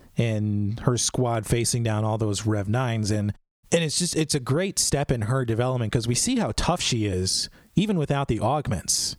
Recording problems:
squashed, flat; somewhat

